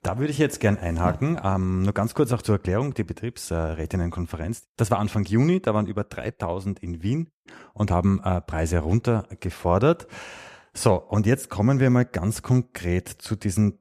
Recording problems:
none

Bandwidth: 14.5 kHz